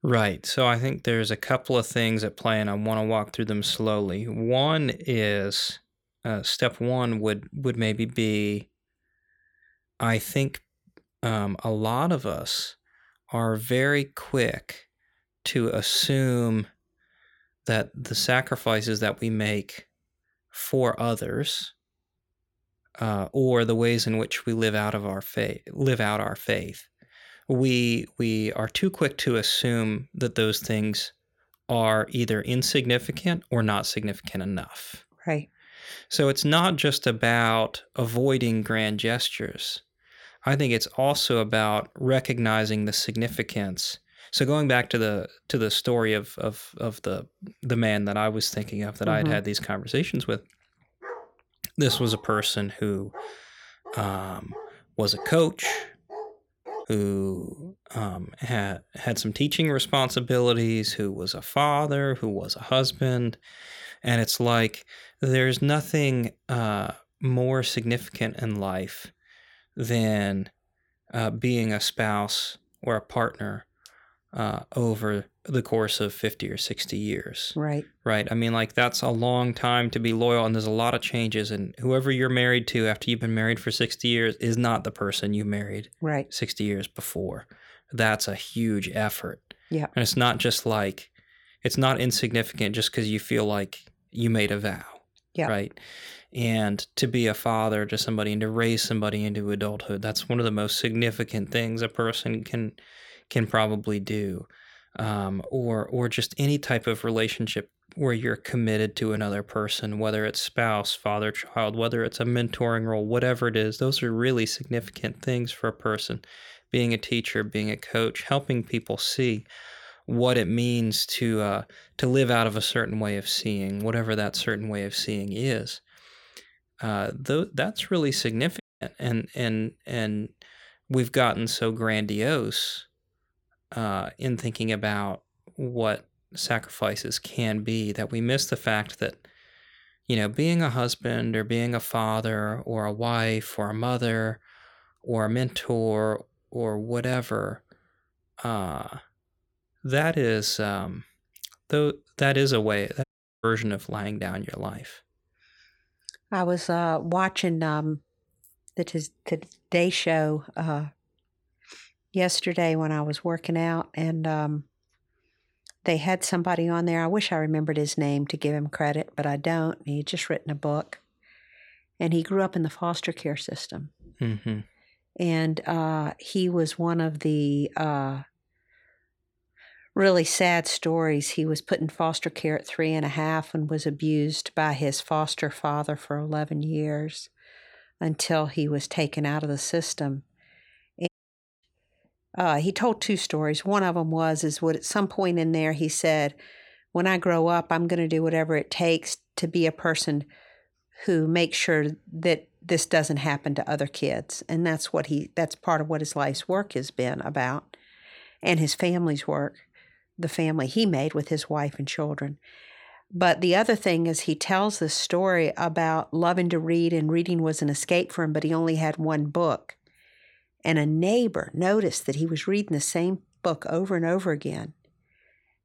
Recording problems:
dog barking; faint; from 51 to 57 s; peak 10 dB below the speech
audio cutting out; at 2:09, at 2:33 and at 3:11 for 0.5 s

